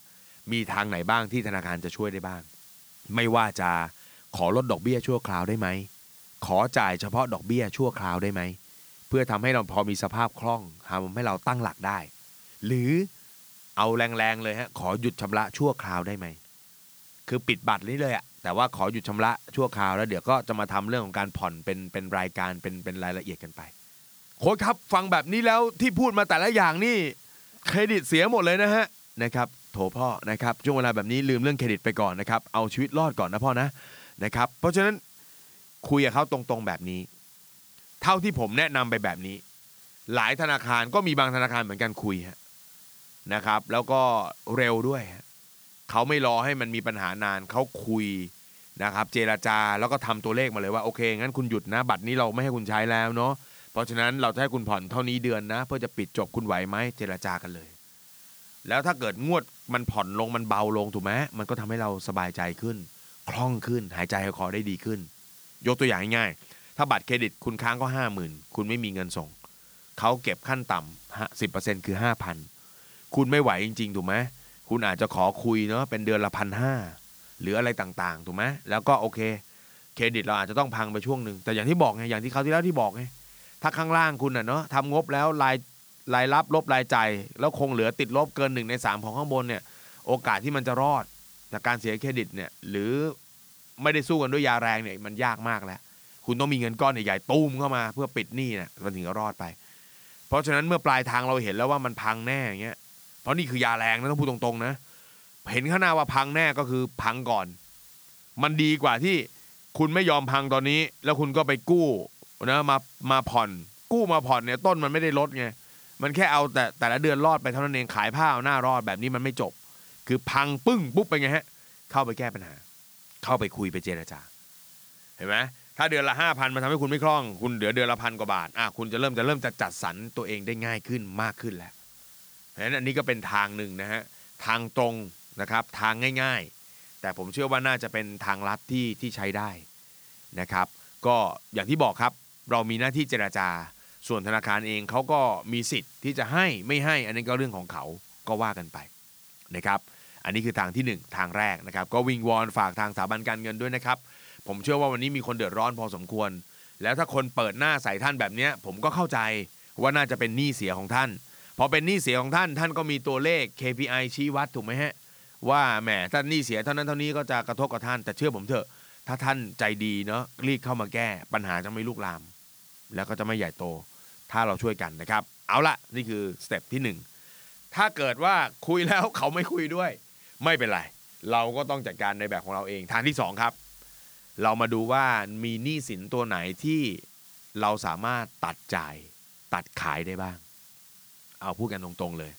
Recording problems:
hiss; faint; throughout; 20 dB below the speech

